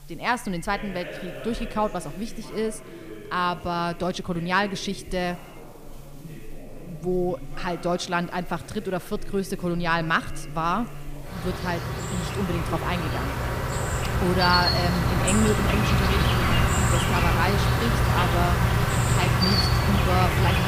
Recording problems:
echo of what is said; faint; throughout; 100 ms later, 25 dB below the speech
animal sounds; very loud; throughout; 4 dB above the speech
voice in the background; noticeable; throughout; 15 dB below the speech
hiss; faint; throughout; 30 dB below the speech

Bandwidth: 15 kHz